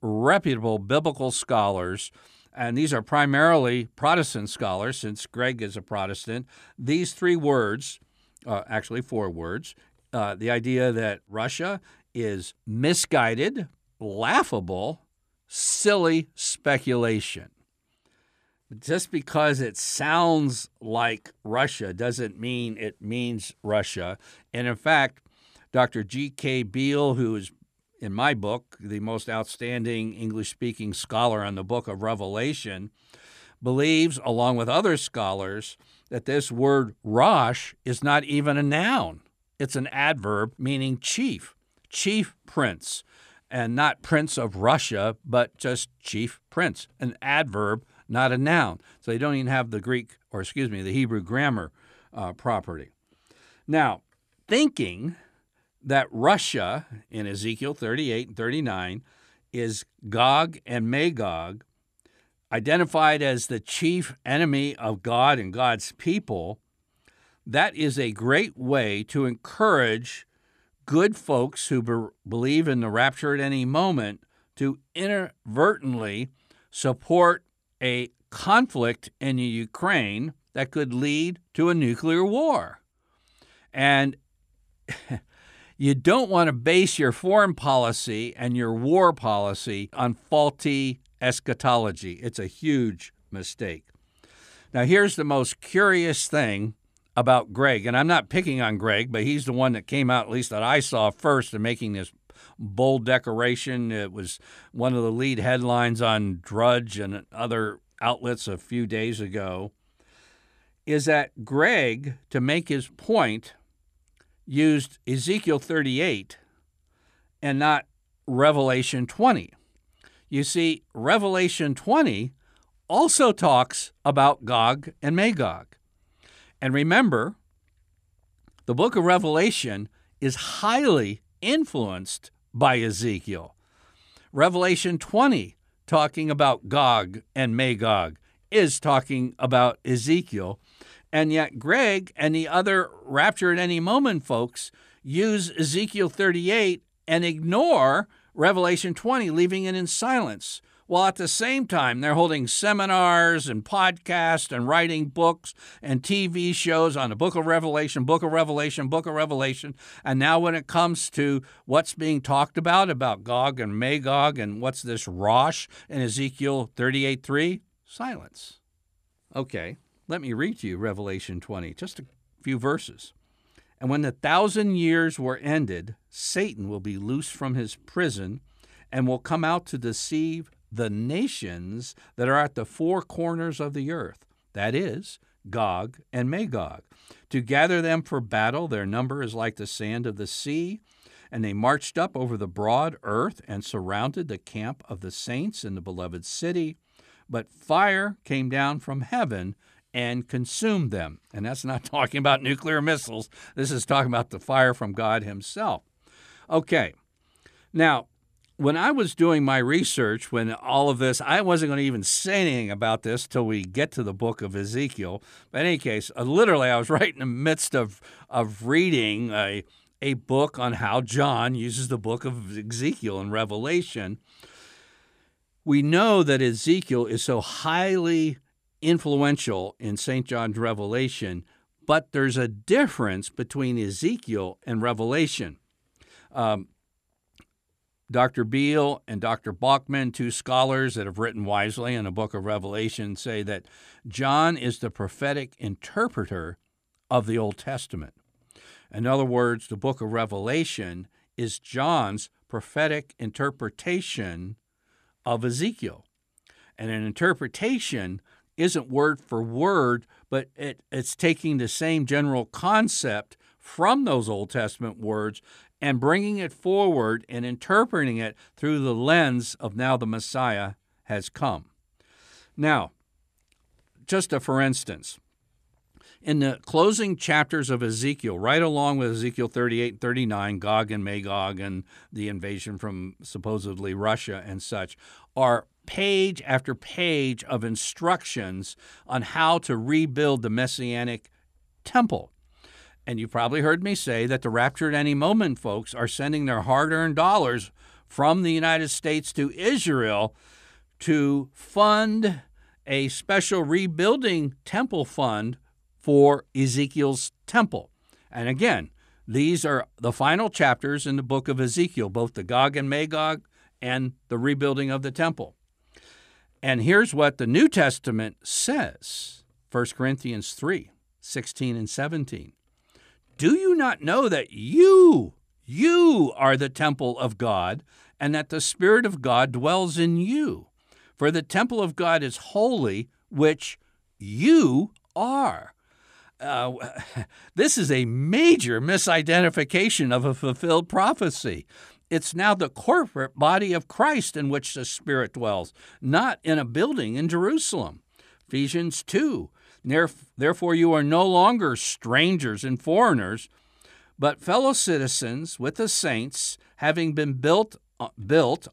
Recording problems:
none

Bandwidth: 14.5 kHz